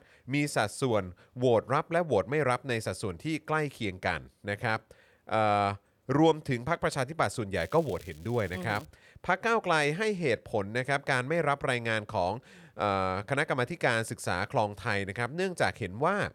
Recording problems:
crackling; faint; from 7.5 to 9 s; 25 dB below the speech

